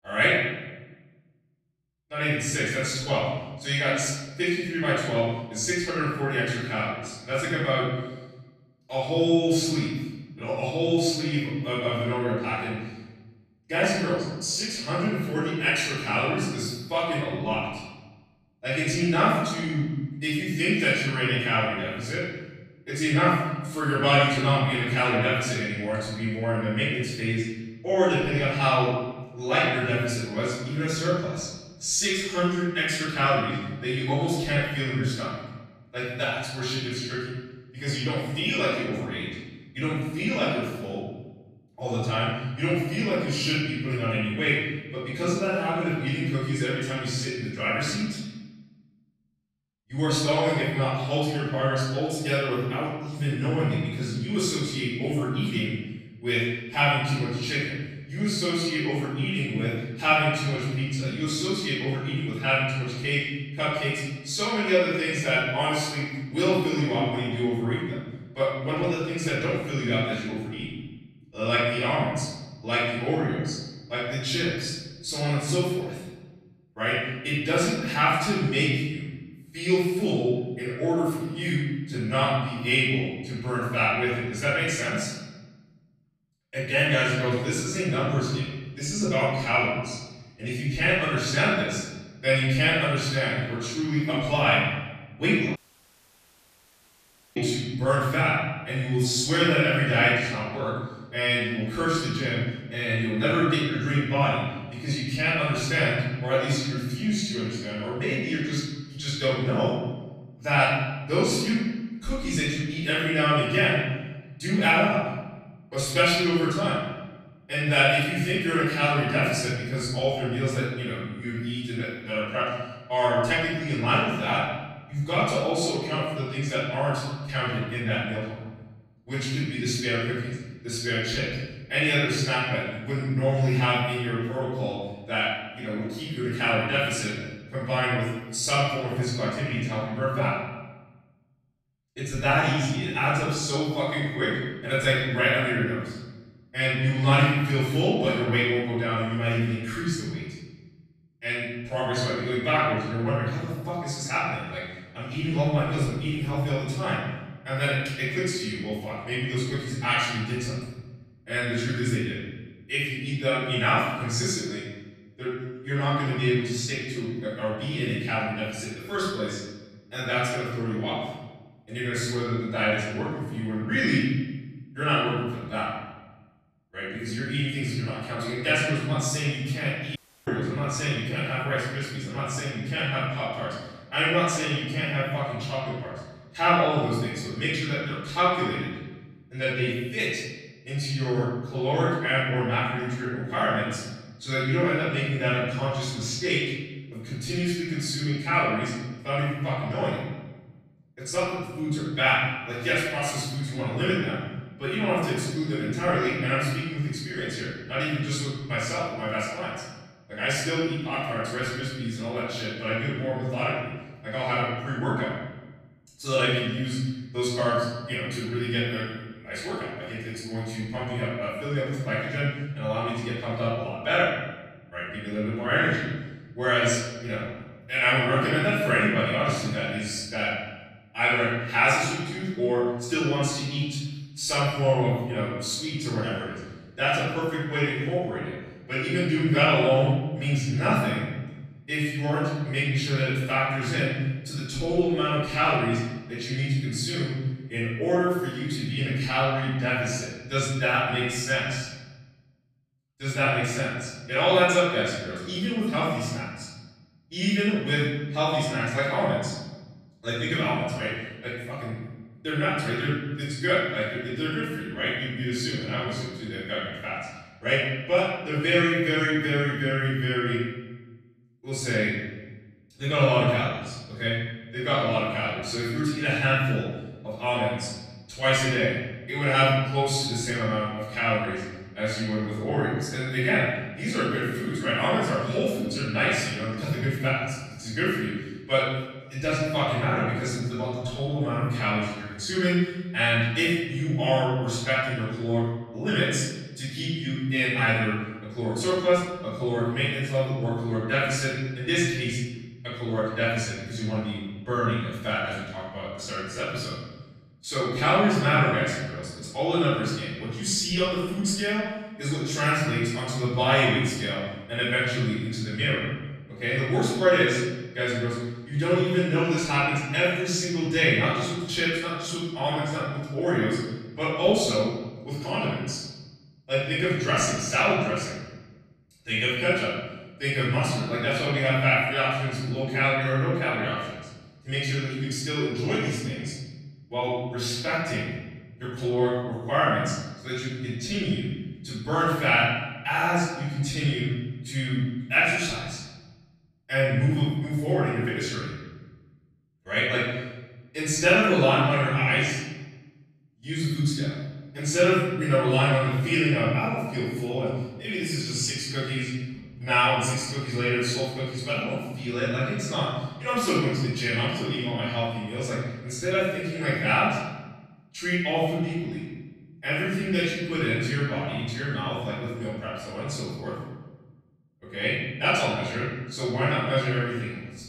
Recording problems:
room echo; strong; dies away in 1.1 s
off-mic speech; far
audio cutting out; at 1:36 for 2 s and at 3:00

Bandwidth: 14.5 kHz